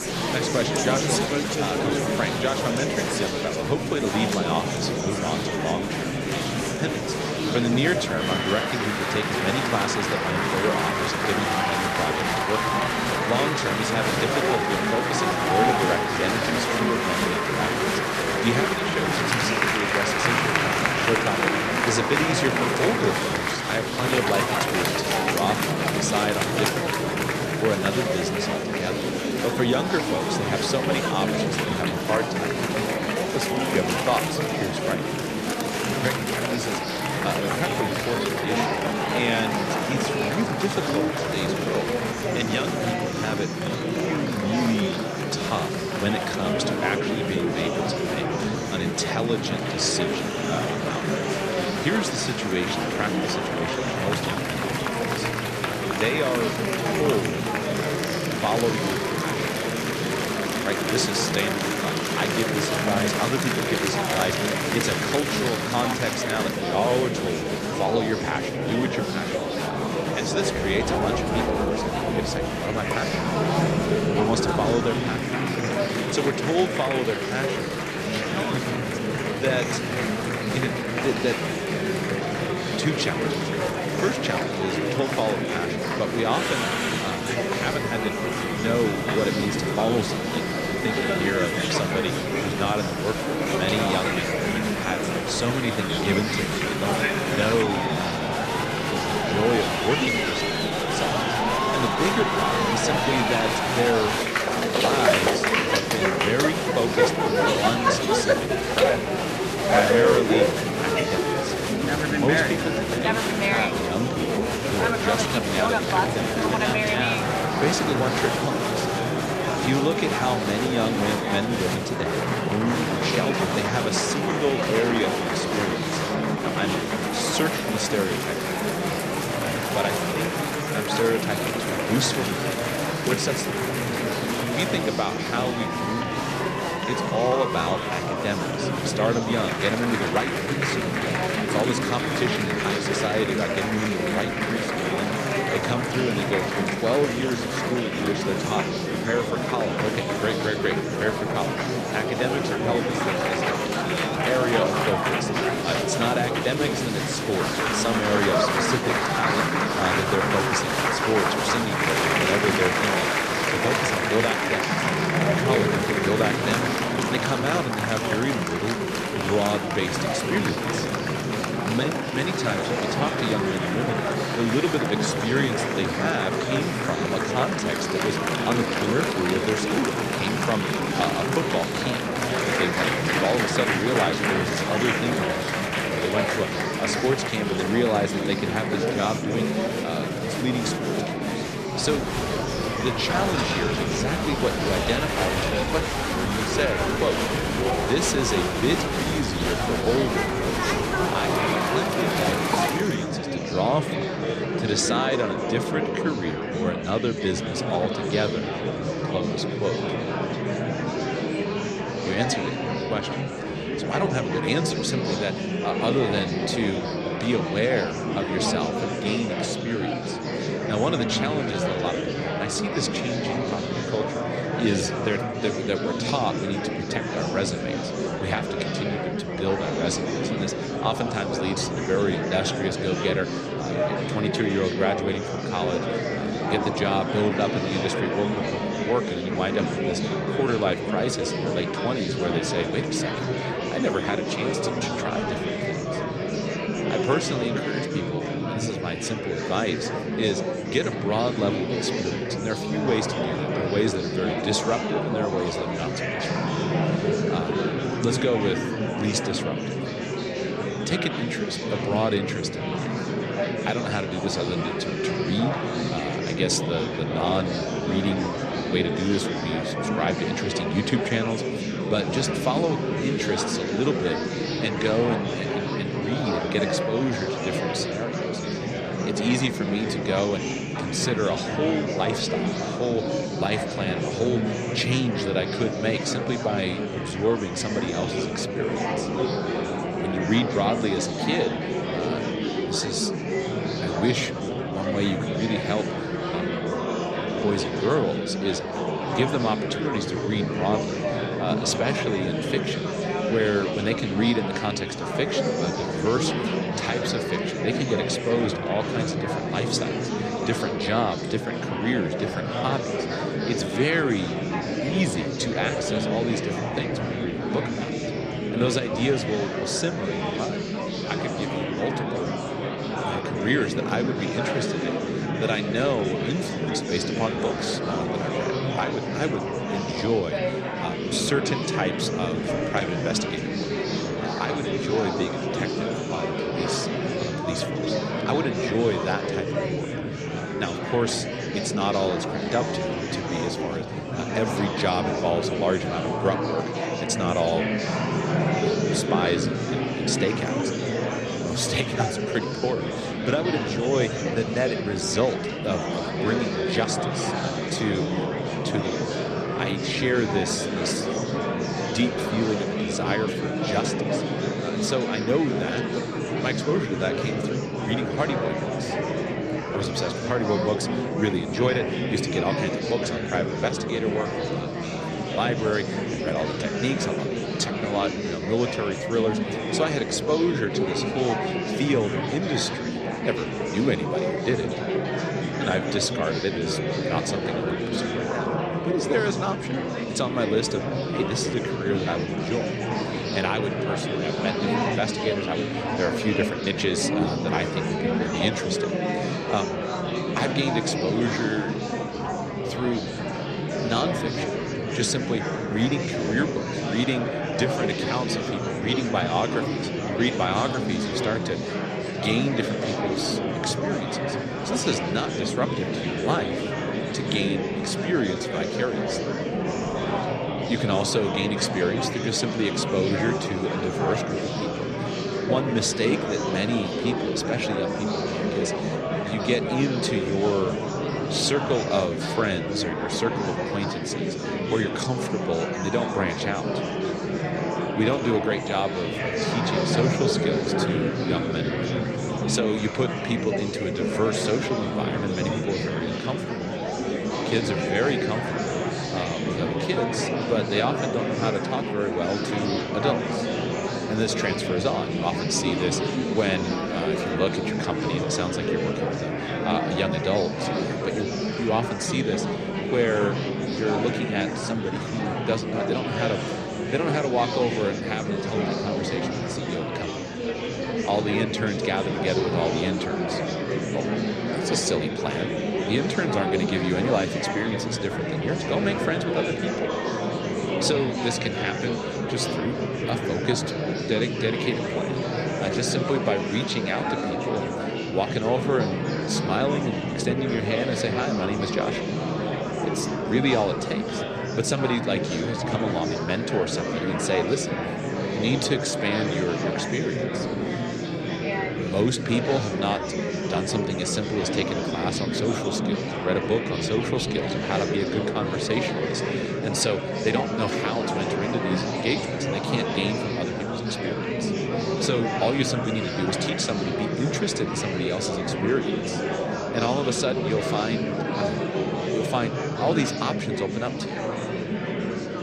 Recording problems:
murmuring crowd; very loud; throughout; 2 dB above the speech

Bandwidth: 14 kHz